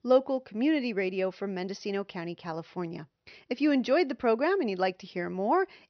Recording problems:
high frequencies cut off; noticeable; nothing above 6 kHz

